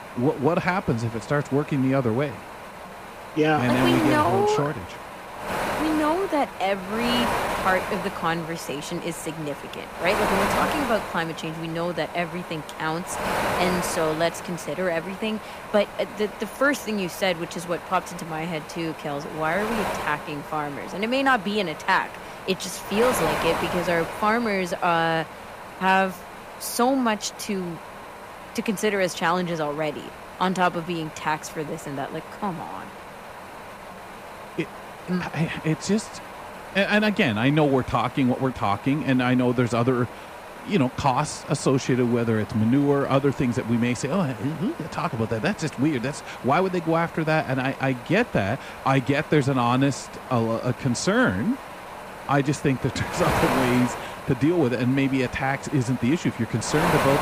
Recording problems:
wind noise on the microphone; heavy; 7 dB below the speech

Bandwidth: 15 kHz